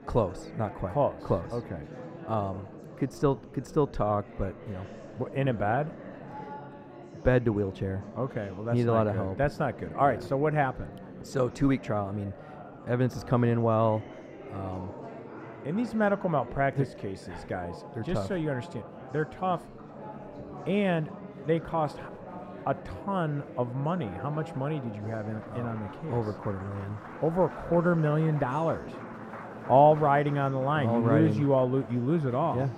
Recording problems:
muffled; slightly; fading above 2 kHz
murmuring crowd; noticeable; throughout; 15 dB below the speech

